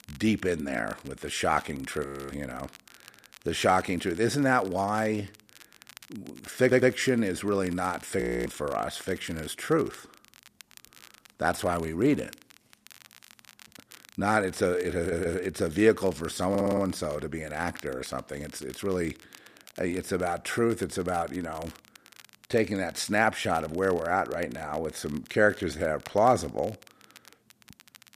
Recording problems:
crackle, like an old record; faint; 25 dB below the speech
audio freezing; at 2 s and at 8 s
audio stuttering; at 6.5 s, at 15 s and at 17 s

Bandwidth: 14.5 kHz